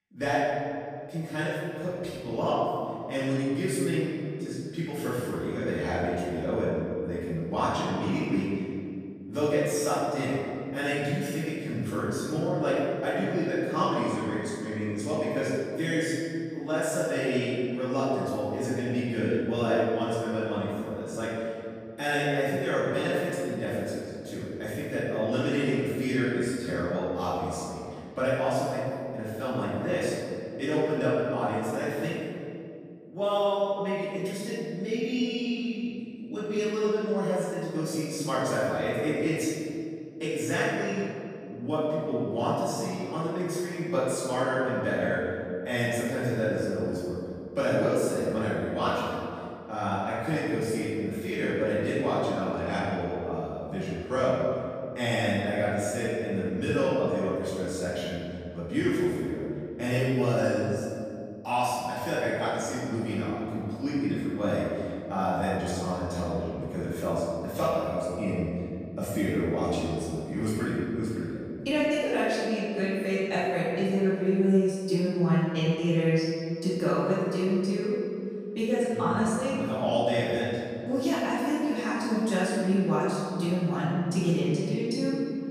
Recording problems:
room echo; strong; dies away in 2.3 s
off-mic speech; far

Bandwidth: 15 kHz